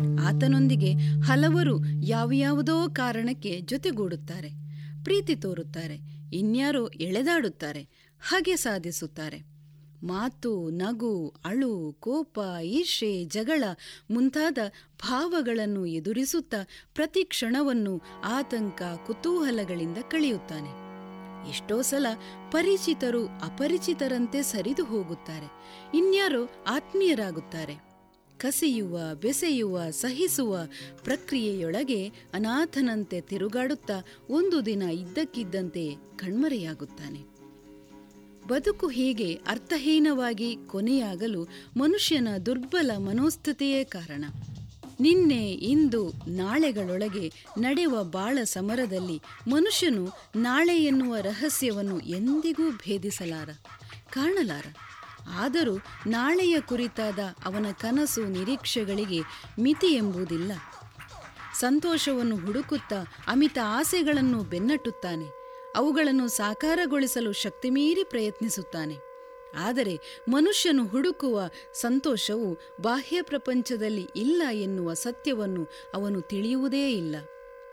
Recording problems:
background music; noticeable; throughout; 10 dB below the speech

